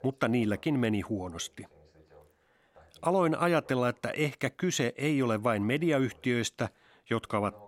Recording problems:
voice in the background; faint; throughout; 30 dB below the speech

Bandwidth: 16 kHz